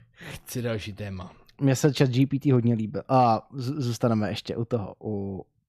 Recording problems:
none

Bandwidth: 14.5 kHz